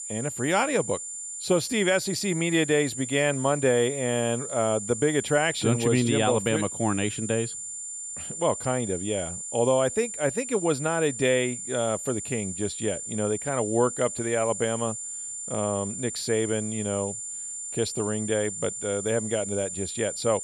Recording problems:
high-pitched whine; loud; throughout; 7 kHz, 6 dB below the speech

